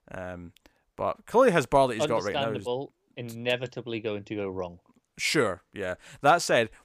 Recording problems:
none

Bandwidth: 15 kHz